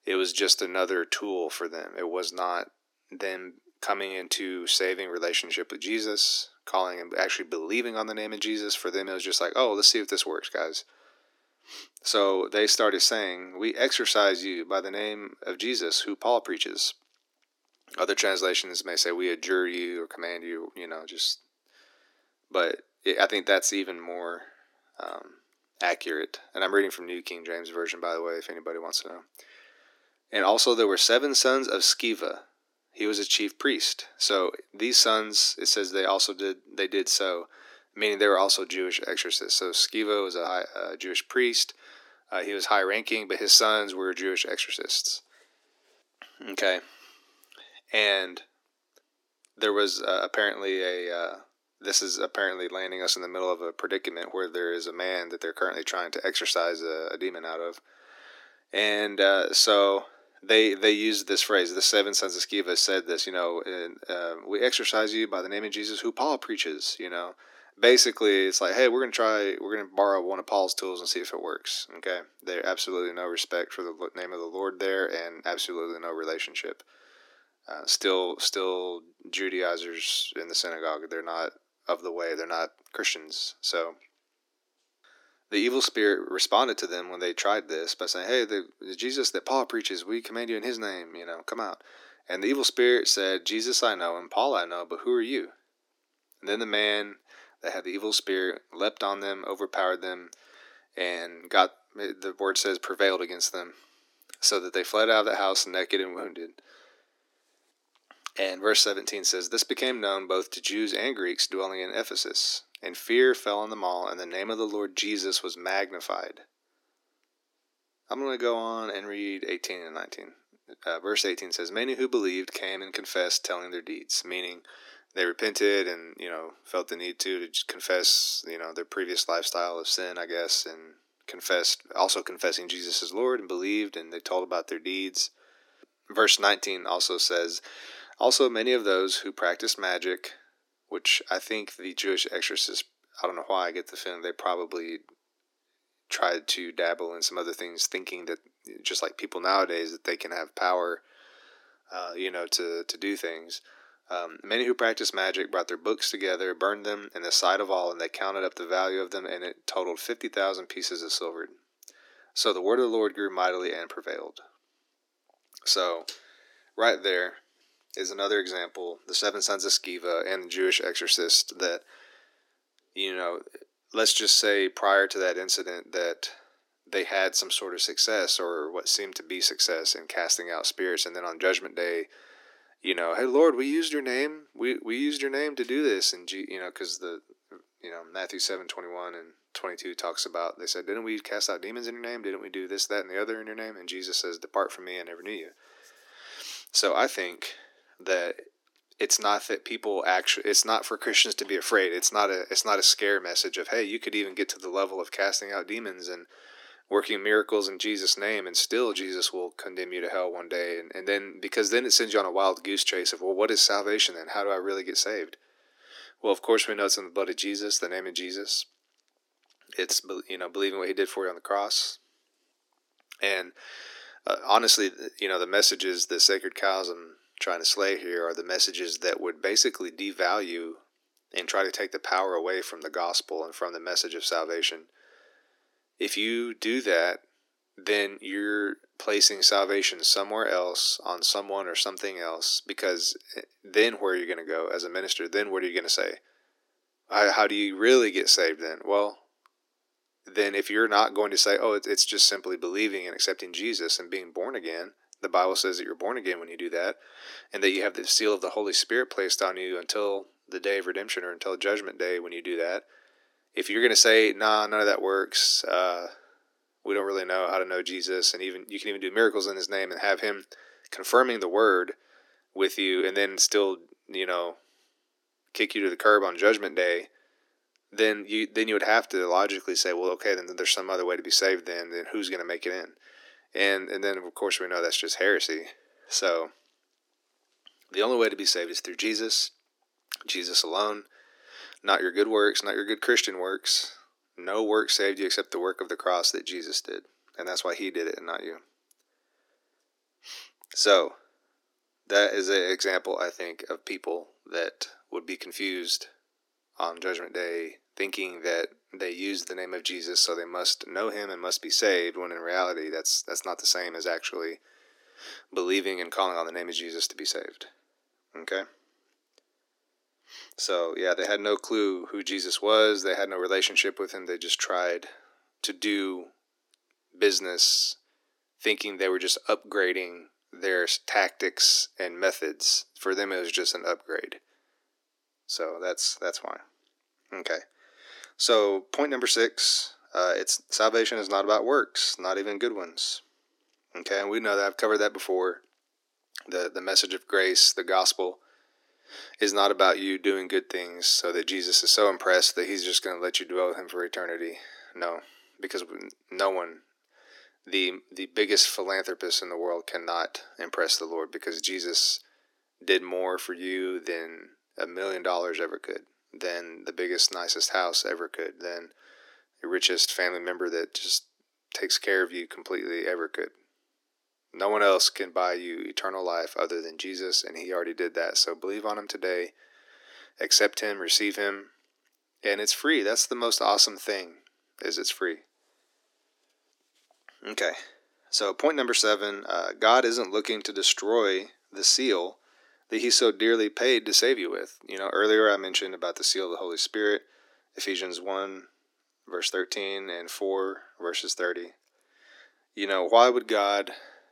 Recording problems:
thin; somewhat; fading below 300 Hz

